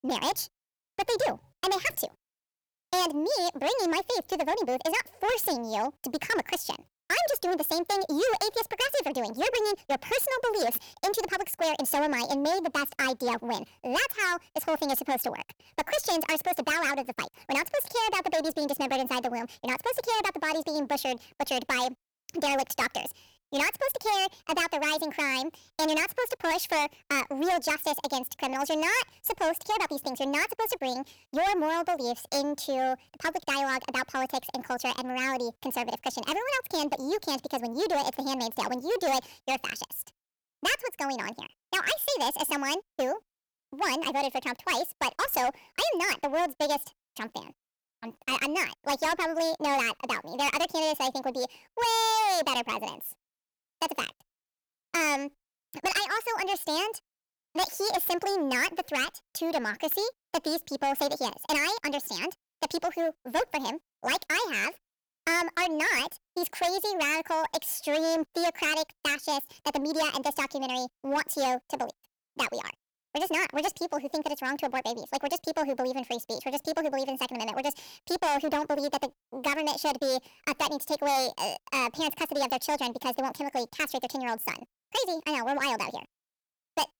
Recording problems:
distortion; heavy; 9% of the sound clipped
wrong speed and pitch; too fast and too high; 1.5 times normal speed

